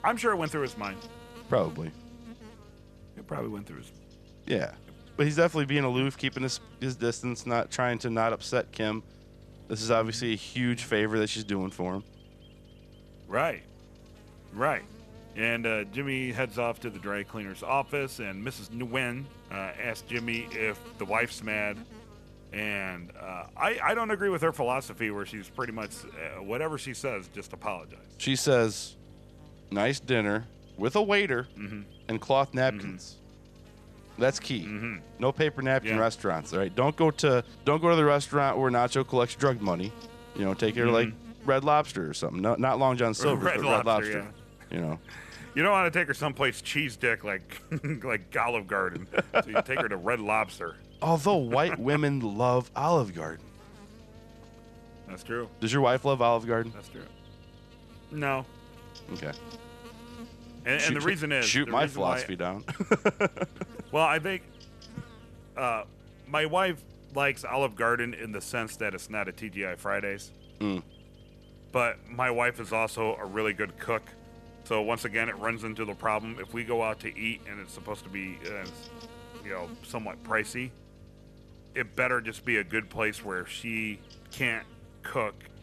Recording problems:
electrical hum; faint; throughout; 50 Hz, 25 dB below the speech

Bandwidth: 13.5 kHz